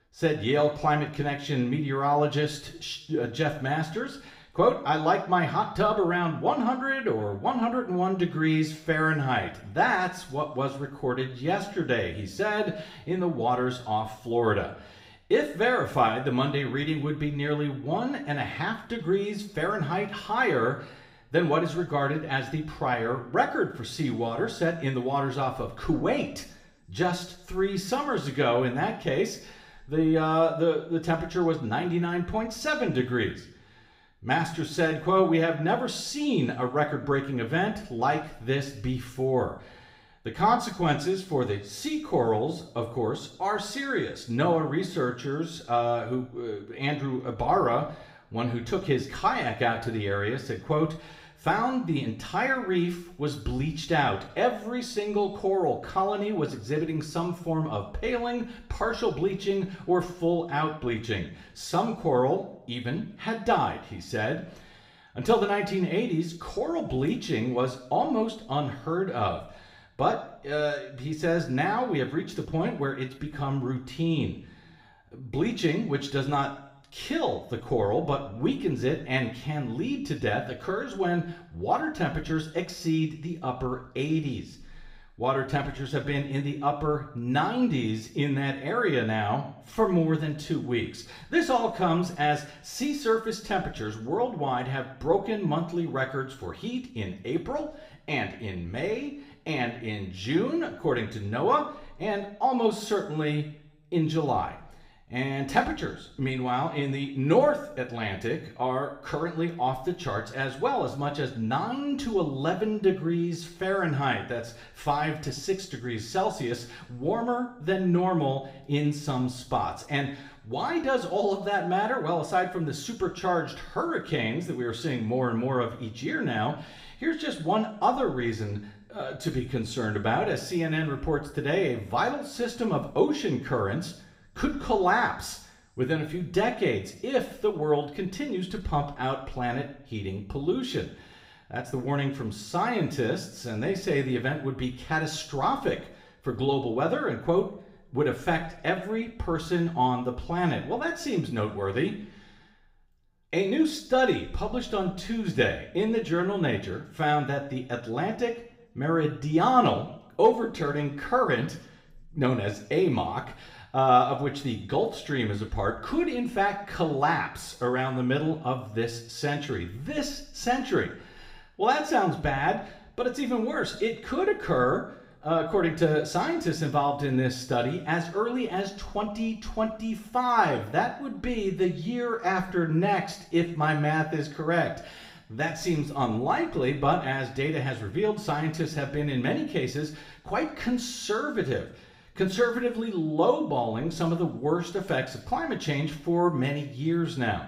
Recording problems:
room echo; slight; dies away in 0.6 s
off-mic speech; somewhat distant

